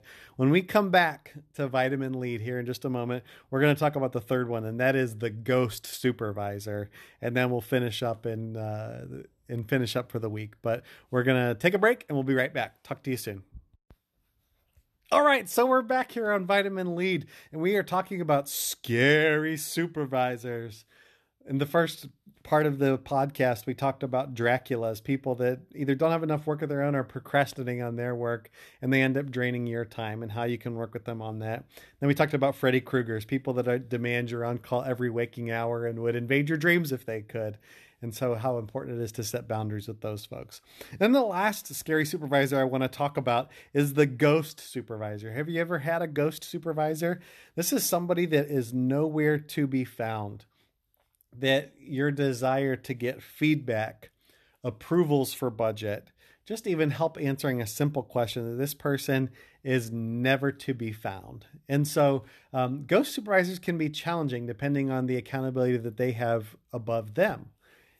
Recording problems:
none

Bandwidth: 13.5 kHz